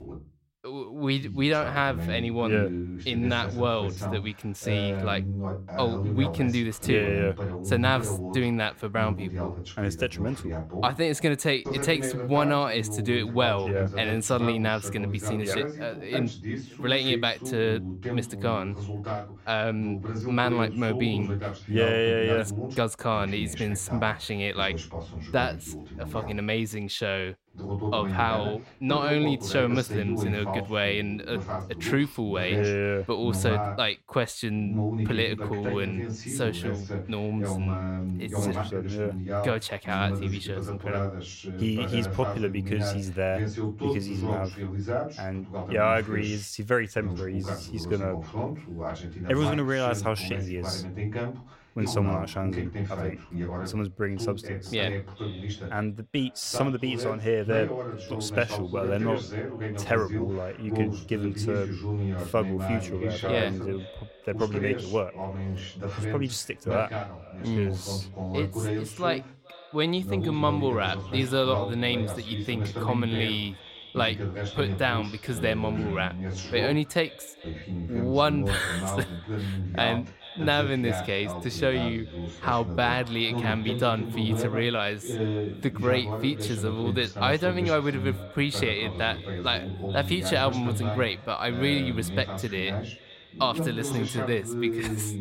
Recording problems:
echo of what is said; faint; from 53 s on; 420 ms later, 20 dB below the speech
voice in the background; loud; throughout; 5 dB below the speech

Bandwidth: 16 kHz